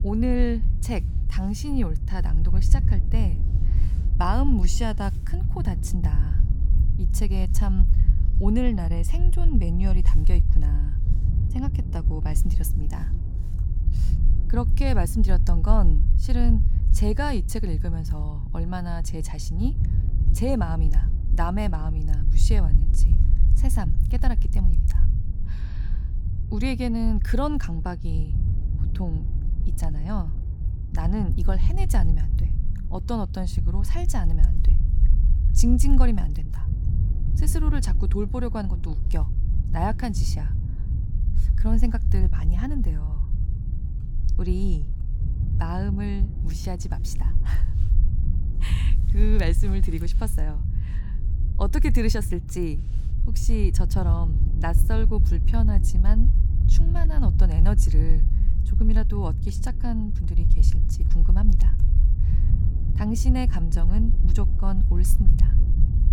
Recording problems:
low rumble; loud; throughout; 9 dB below the speech

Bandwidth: 18 kHz